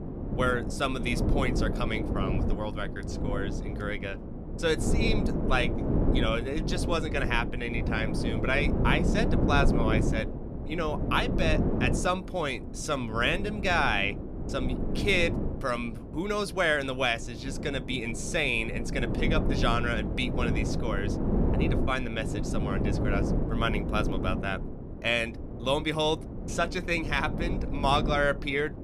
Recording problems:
wind noise on the microphone; heavy; 8 dB below the speech

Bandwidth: 14.5 kHz